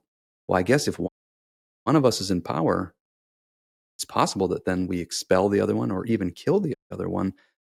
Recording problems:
audio cutting out; at 1 s for 1 s and at 7 s

